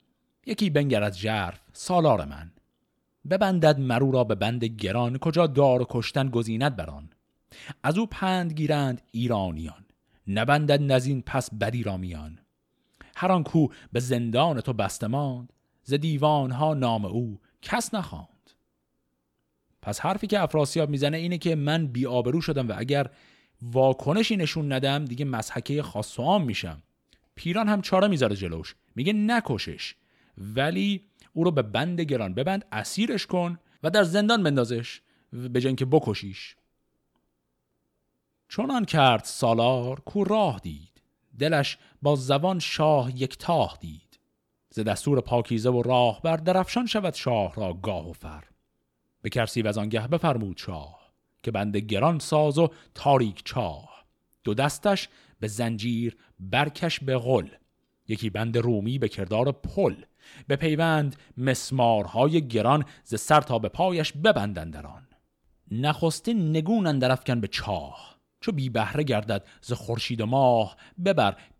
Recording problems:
none

